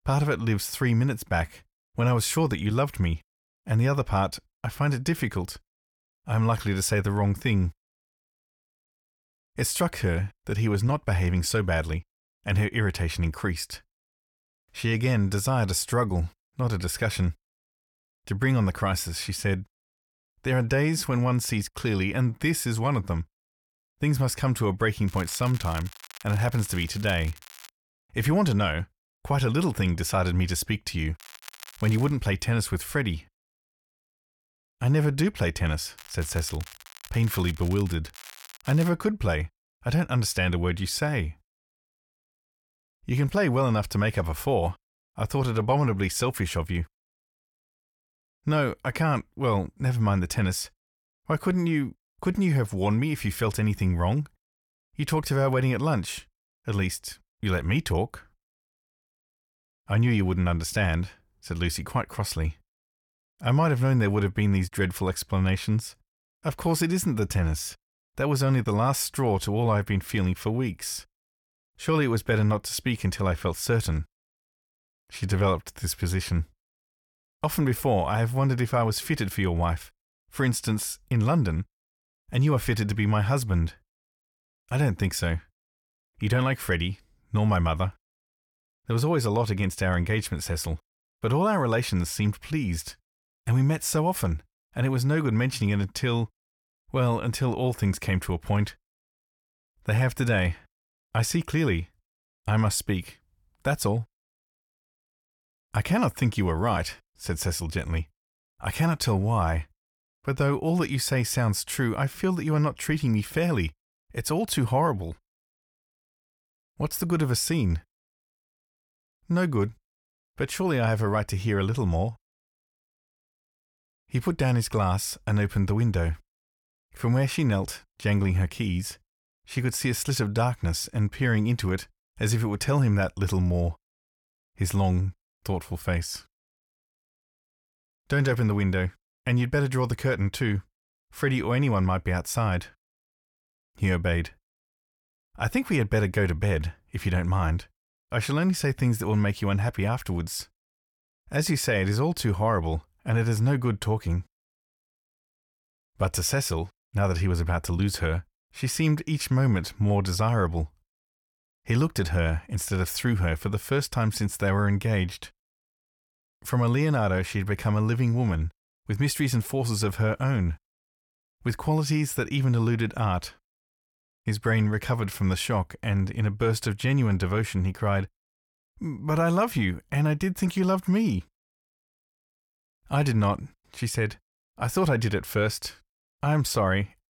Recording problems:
crackling; noticeable; from 25 to 28 s, at 31 s and from 36 to 39 s; 20 dB below the speech

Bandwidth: 17.5 kHz